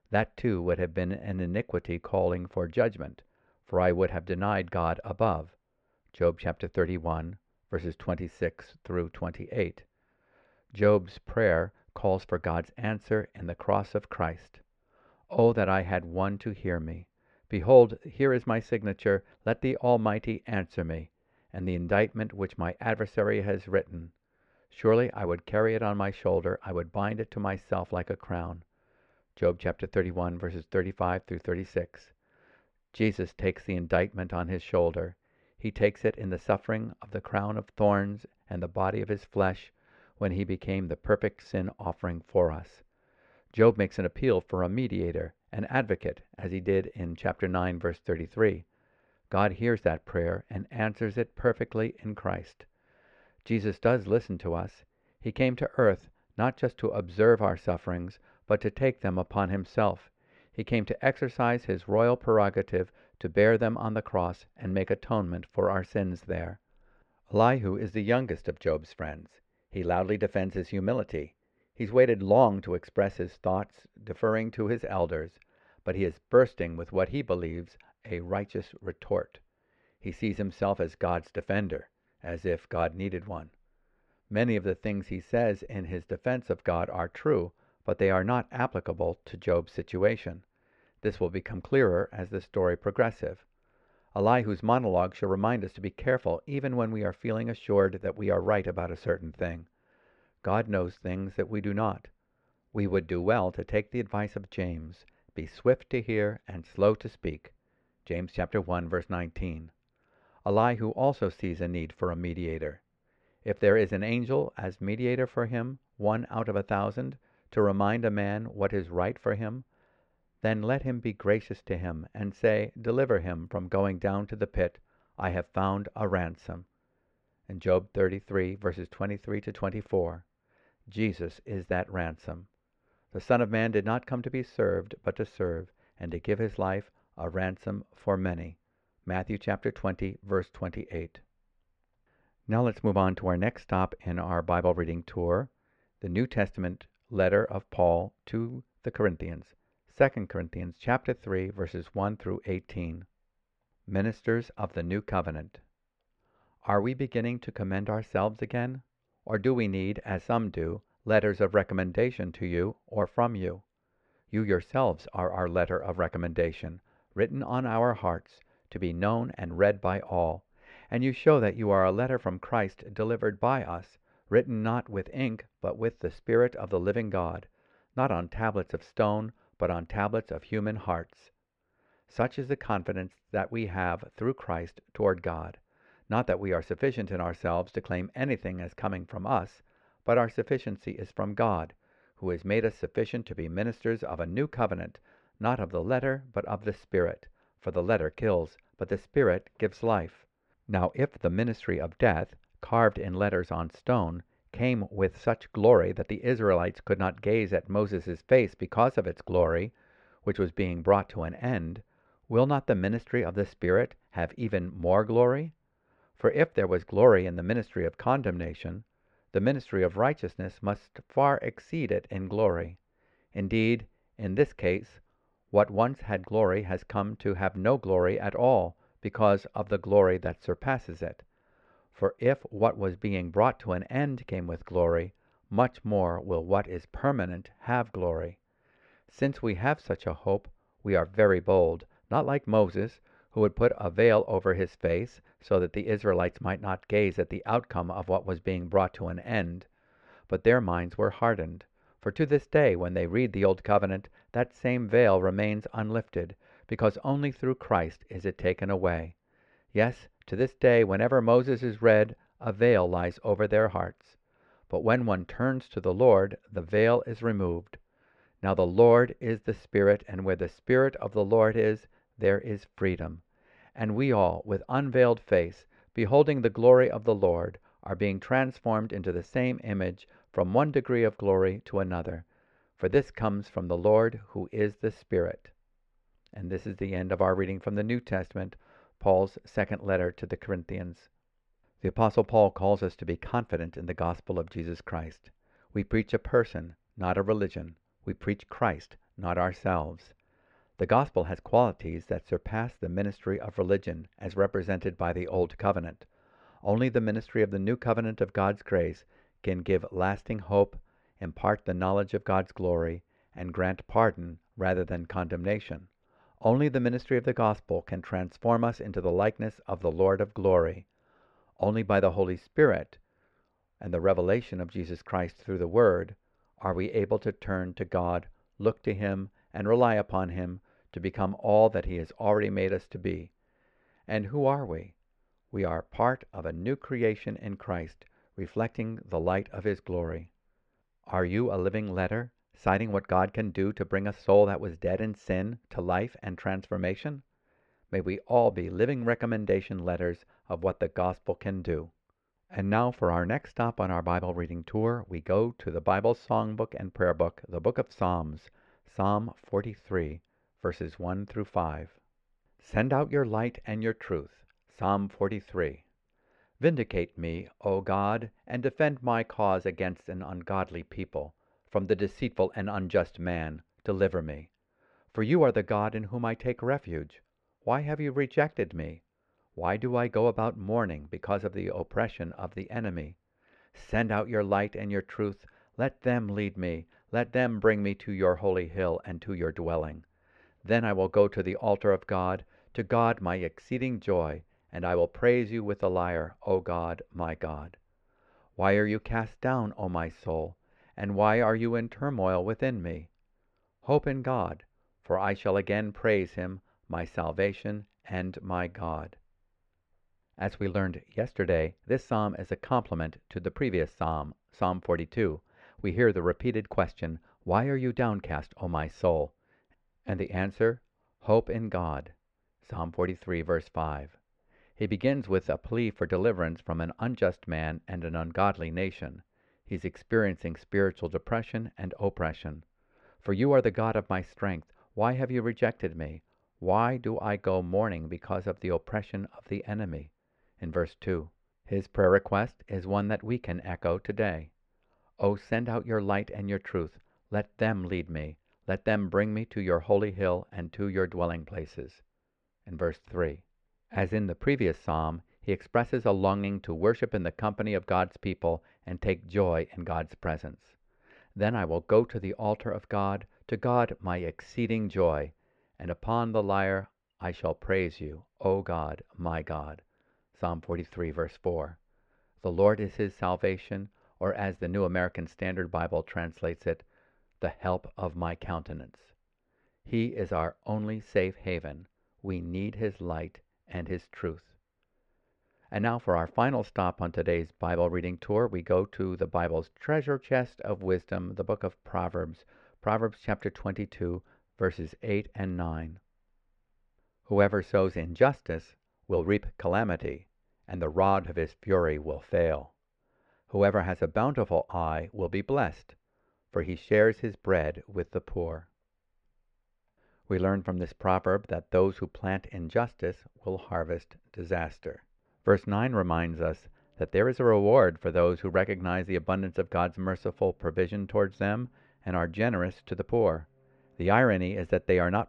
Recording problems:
muffled; very; fading above 2 kHz

